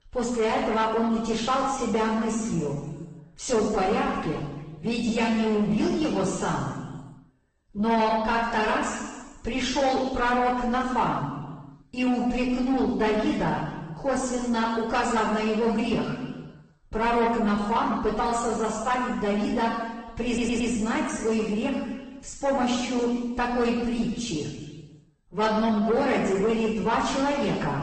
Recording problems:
off-mic speech; far
room echo; noticeable; dies away in 1.2 s
distortion; slight; 10 dB below the speech
garbled, watery; slightly; nothing above 8.5 kHz
audio stuttering; at 20 s

